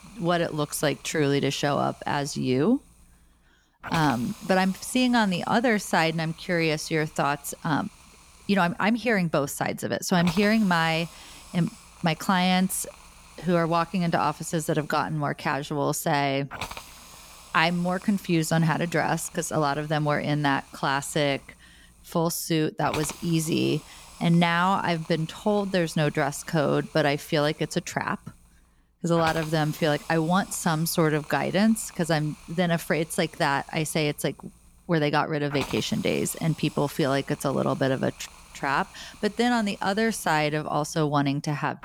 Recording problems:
hiss; noticeable; throughout; 20 dB below the speech

